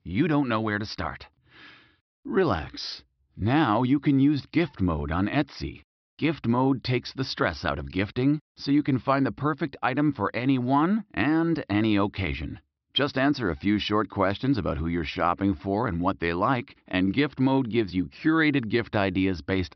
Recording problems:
high frequencies cut off; noticeable; nothing above 5.5 kHz

